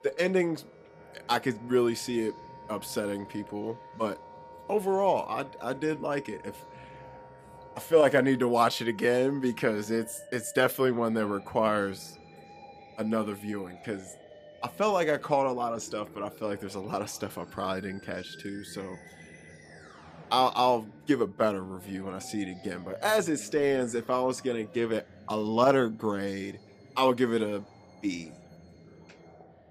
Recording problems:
background music; faint; throughout; 20 dB below the speech
voice in the background; faint; throughout; 25 dB below the speech

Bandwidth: 15 kHz